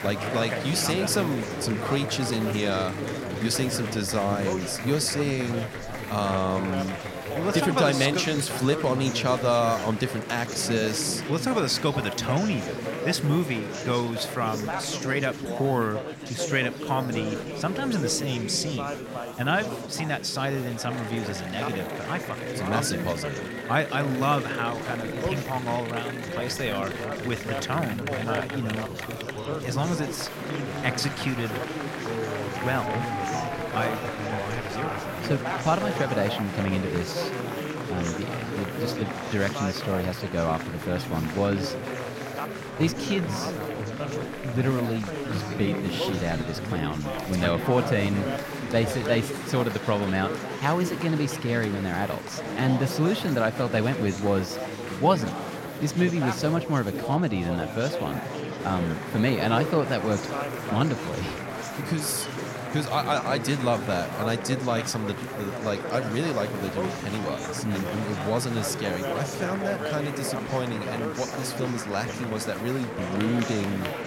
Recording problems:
chatter from many people; loud; throughout; 4 dB below the speech
hiss; faint; throughout; 25 dB below the speech

